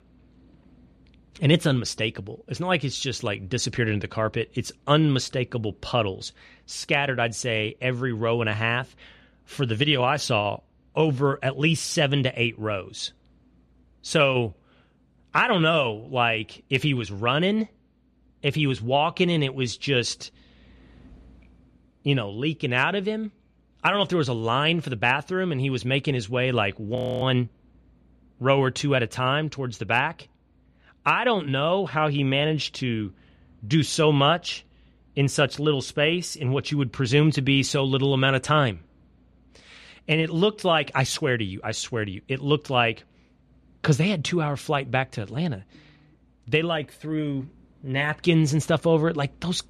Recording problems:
audio freezing; at 27 s

